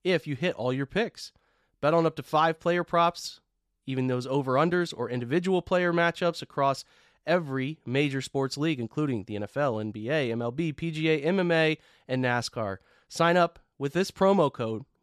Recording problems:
none

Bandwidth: 14 kHz